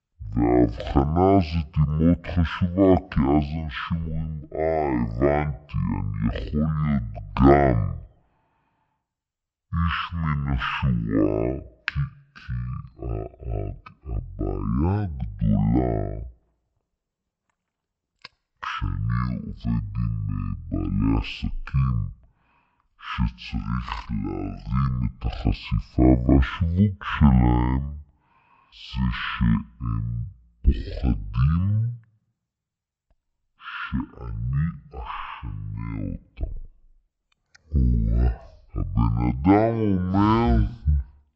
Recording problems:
wrong speed and pitch; too slow and too low; 0.5 times normal speed

